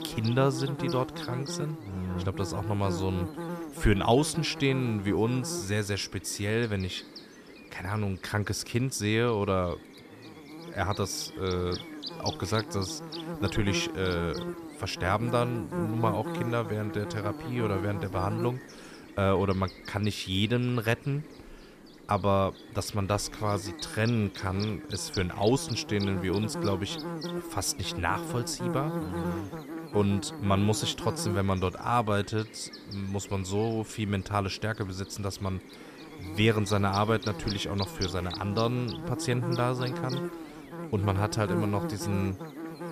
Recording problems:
electrical hum; loud; throughout; 50 Hz, 9 dB below the speech

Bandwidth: 14.5 kHz